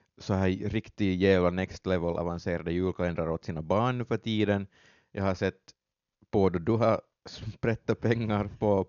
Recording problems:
high frequencies cut off; noticeable; nothing above 7 kHz

